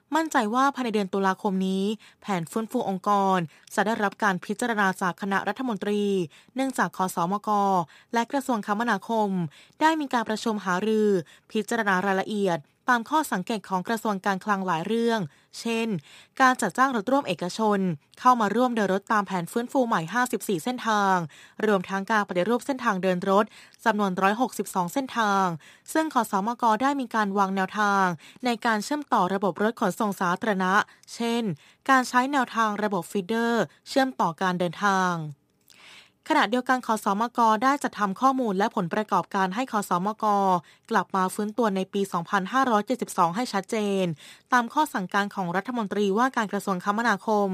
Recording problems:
abrupt cut into speech; at the end

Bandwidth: 15 kHz